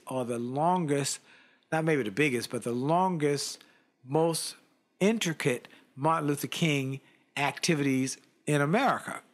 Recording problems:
none

